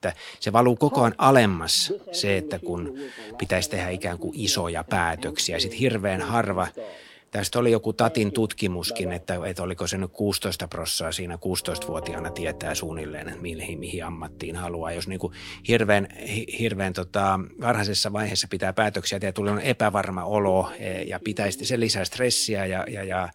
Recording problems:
alarms or sirens; noticeable; throughout; 15 dB below the speech

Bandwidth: 16.5 kHz